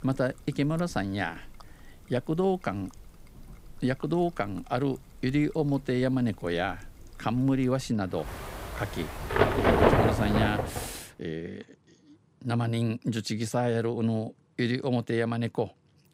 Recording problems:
rain or running water; very loud; until 11 s; 2 dB above the speech

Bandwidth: 15.5 kHz